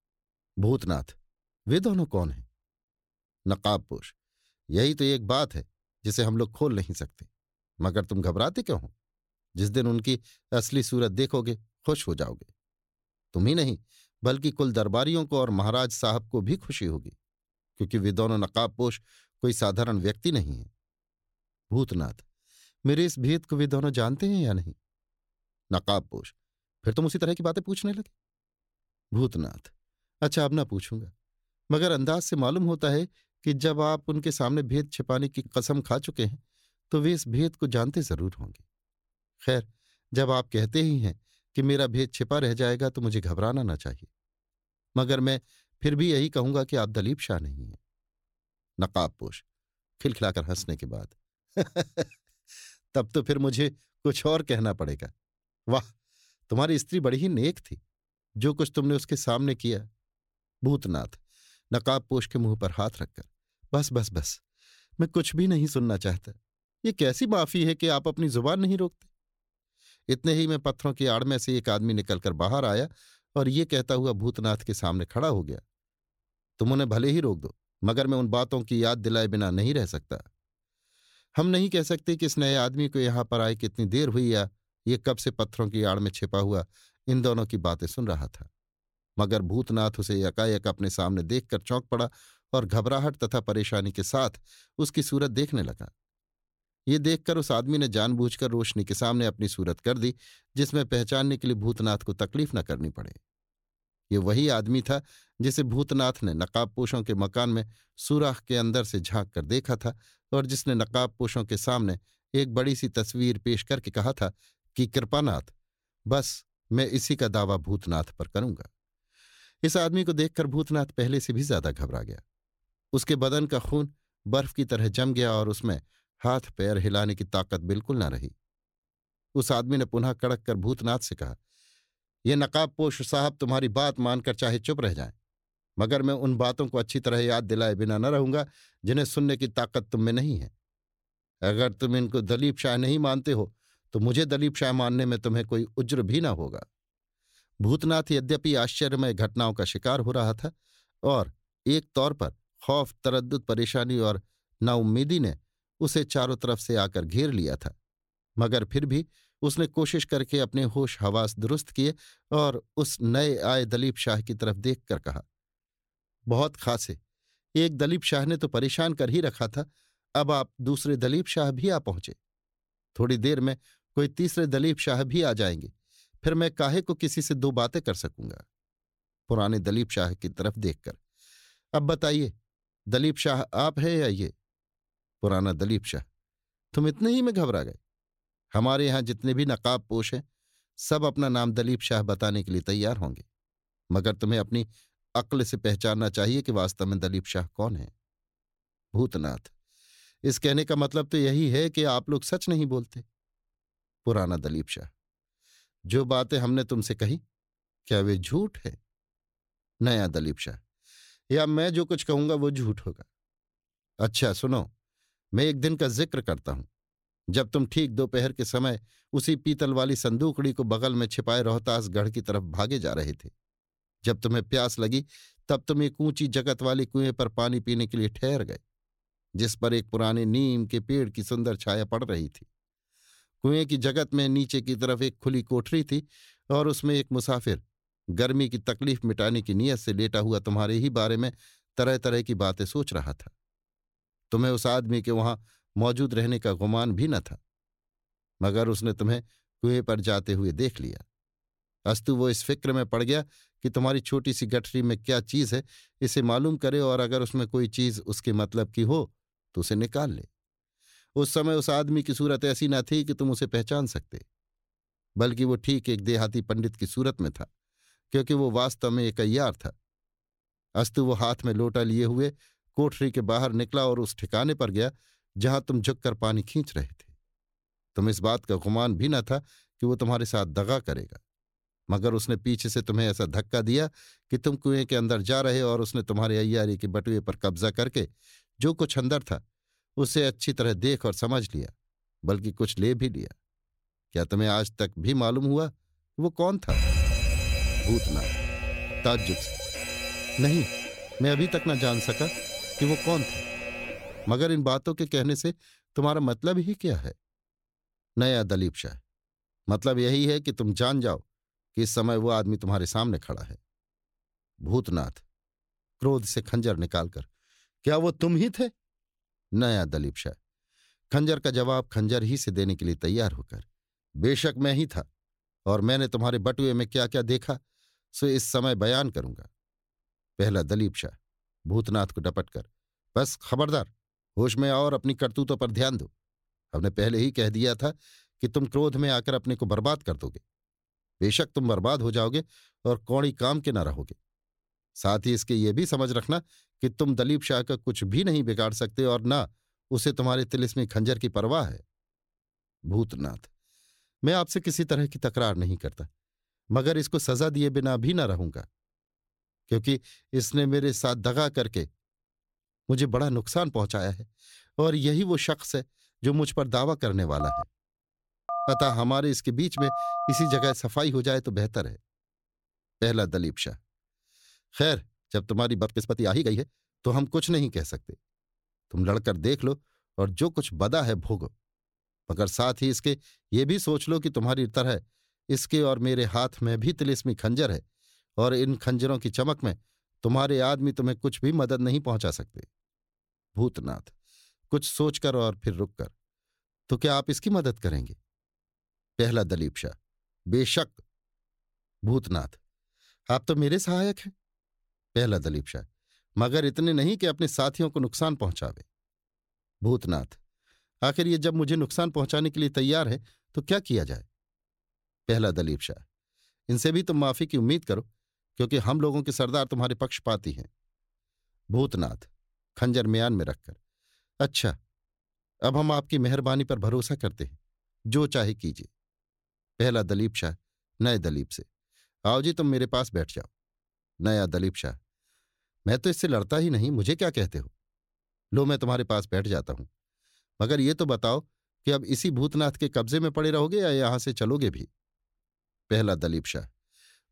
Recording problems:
uneven, jittery; strongly; from 26 s to 6:17
alarm; loud; from 4:57 to 5:04; peak 3 dB above the speech
phone ringing; noticeable; from 6:07 to 6:11; peak 2 dB below the speech

